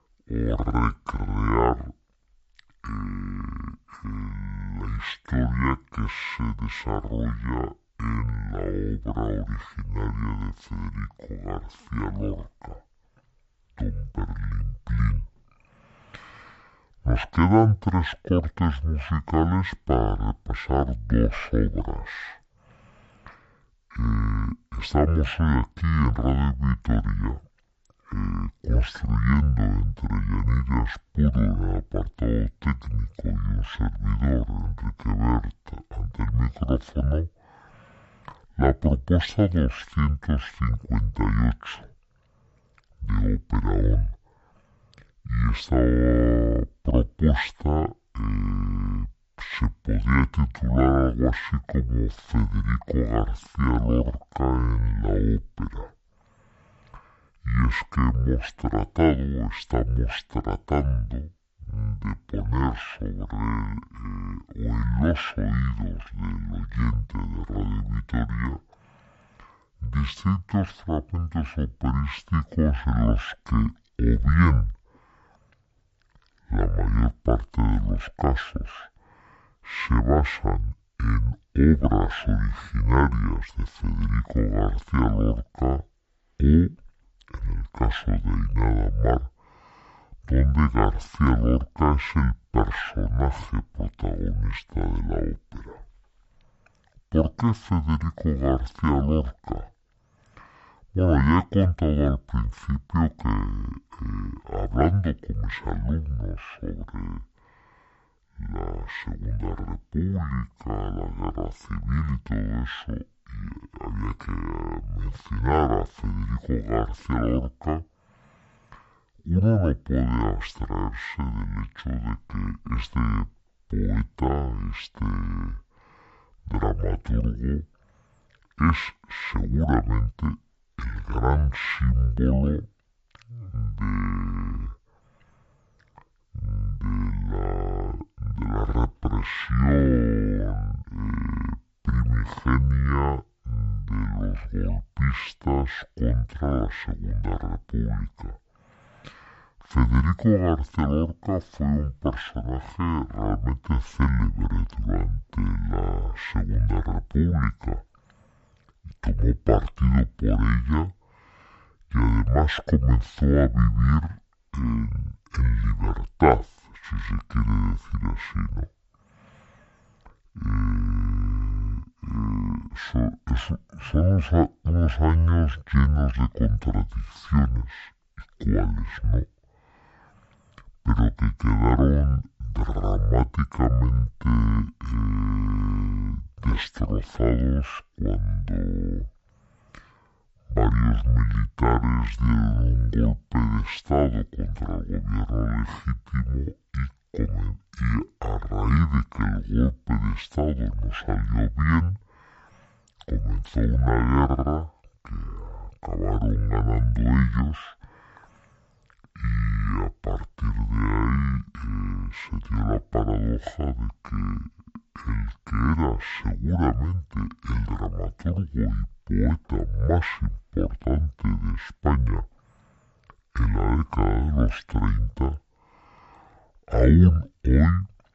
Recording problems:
wrong speed and pitch; too slow and too low; 0.5 times normal speed

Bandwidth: 8 kHz